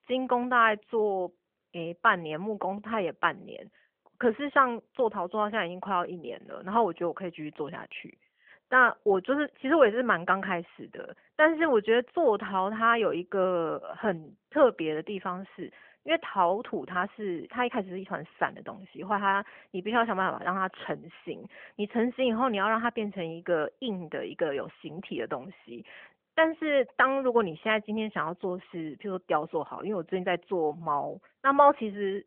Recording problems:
phone-call audio; nothing above 3.5 kHz

